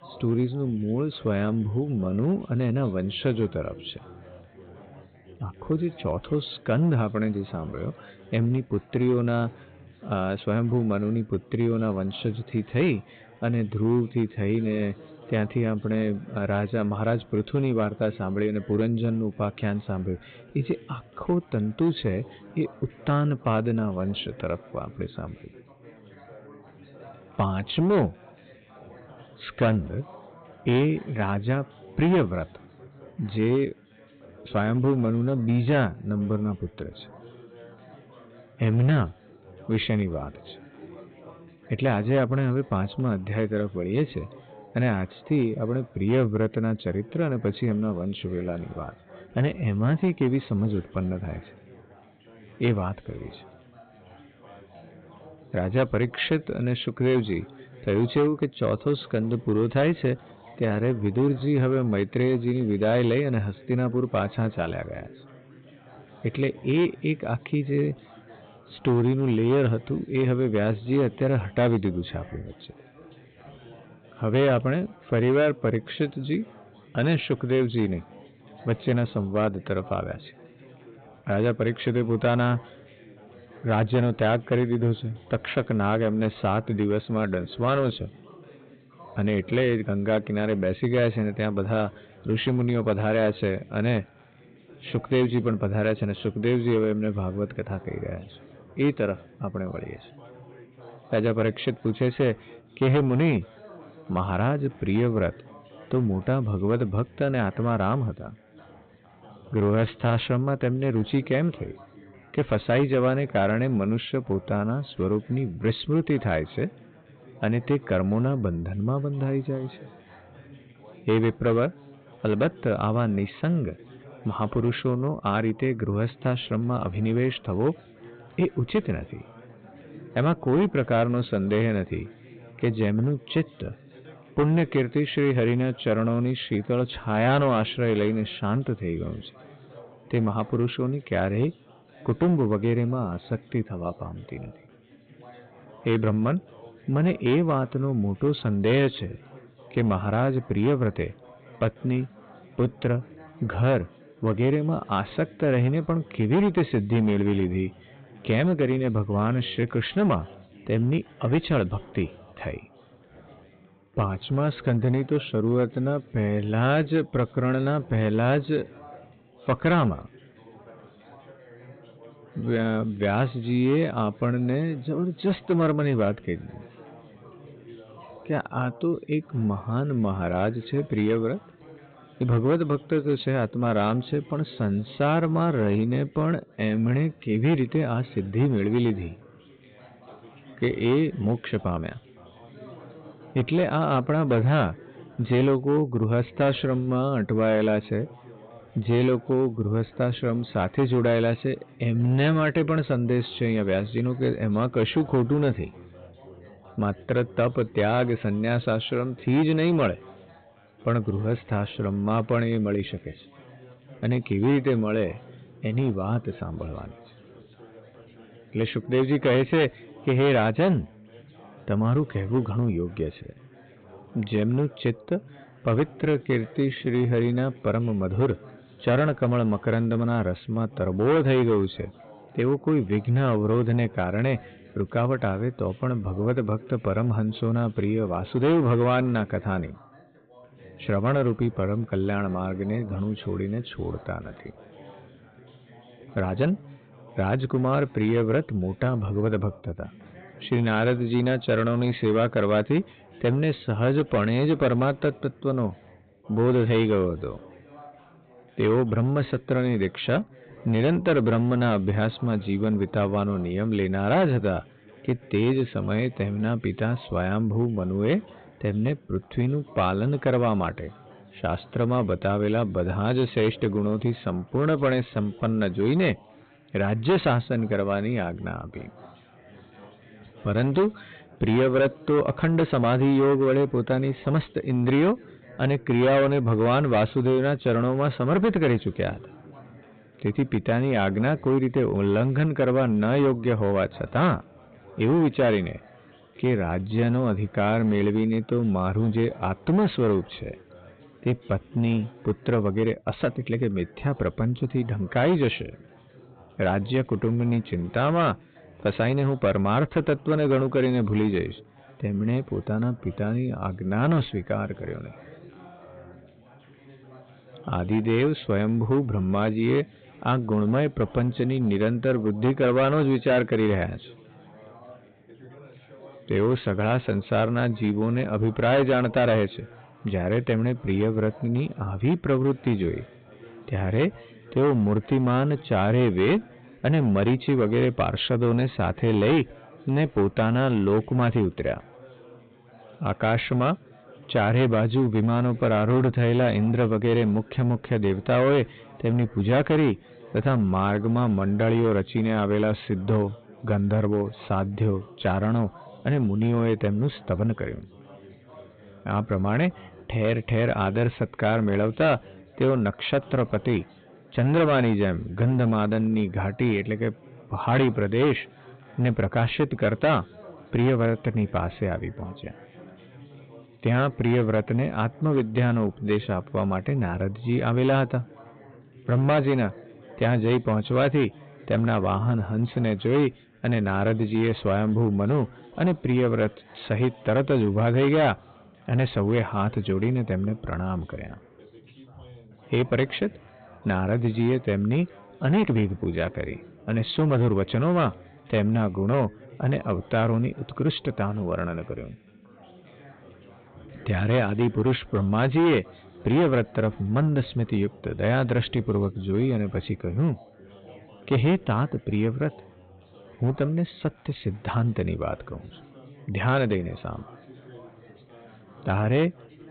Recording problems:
high frequencies cut off; severe; nothing above 4 kHz
distortion; slight; 5% of the sound clipped
background chatter; faint; throughout; 4 voices, 25 dB below the speech
uneven, jittery; strongly; from 56 s to 6:36

